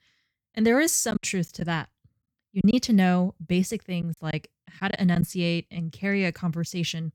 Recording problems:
choppy; very; from 1 to 2.5 s and from 4 to 5 s; 6% of the speech affected

